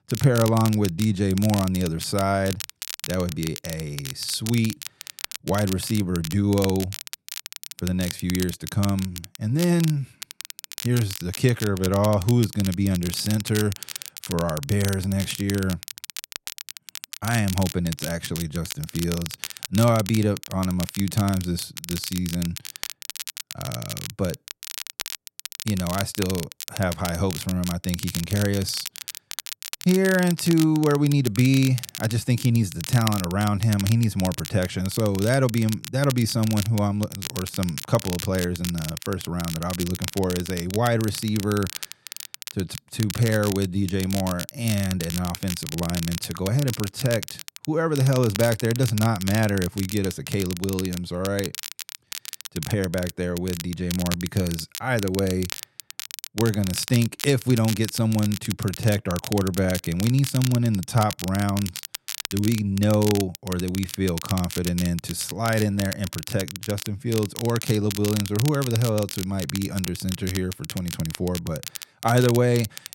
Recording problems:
crackle, like an old record; loud; 10 dB below the speech

